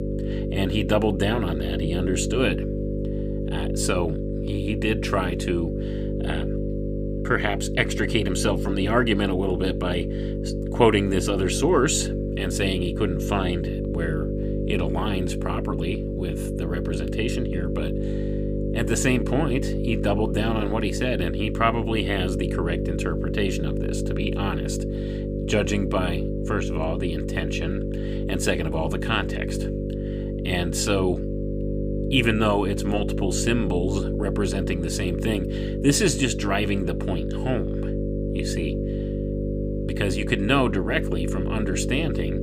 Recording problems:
electrical hum; loud; throughout; 50 Hz, 6 dB below the speech

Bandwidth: 15 kHz